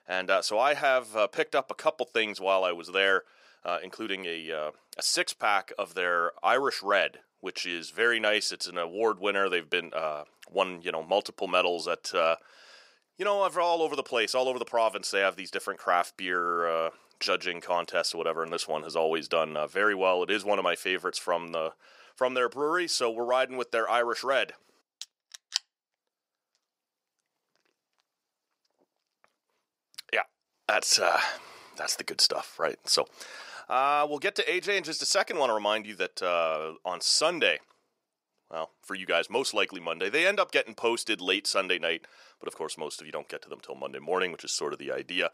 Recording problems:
thin; somewhat; fading below 500 Hz

